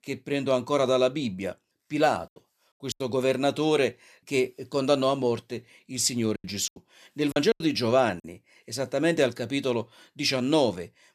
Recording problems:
choppy; very; at 3 s and from 6.5 to 8 s; 8% of the speech affected

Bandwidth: 14.5 kHz